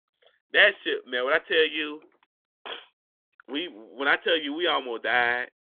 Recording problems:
phone-call audio; nothing above 3.5 kHz

